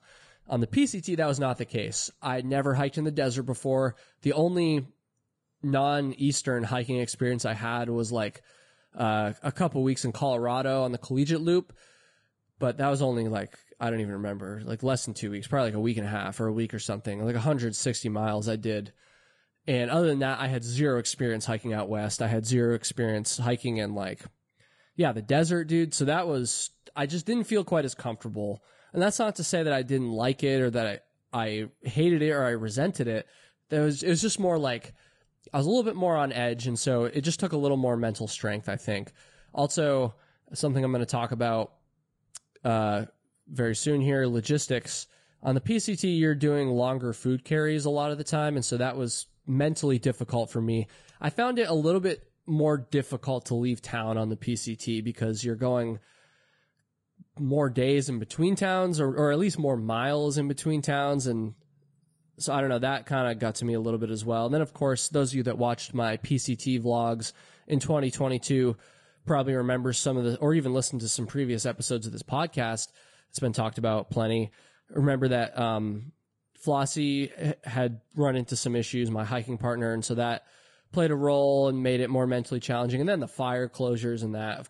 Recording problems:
garbled, watery; slightly

